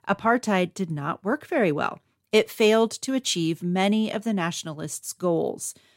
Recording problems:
none

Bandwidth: 16 kHz